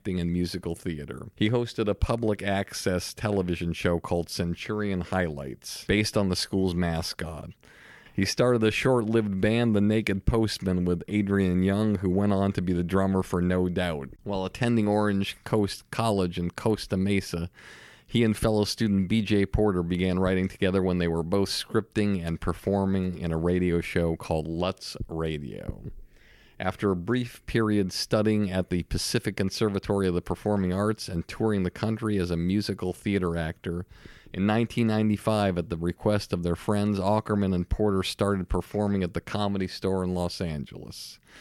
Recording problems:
none

